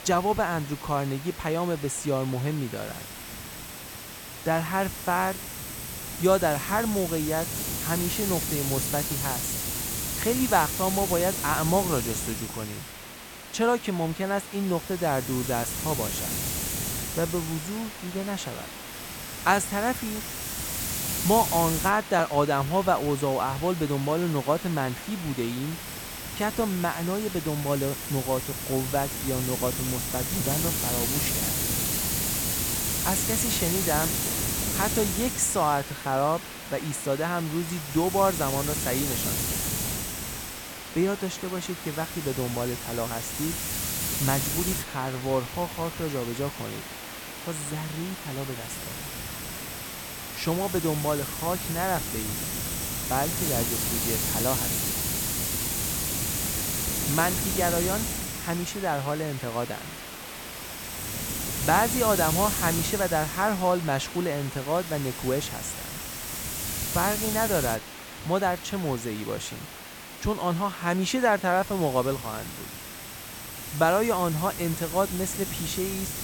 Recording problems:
hiss; loud; throughout; 2 dB below the speech

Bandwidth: 17 kHz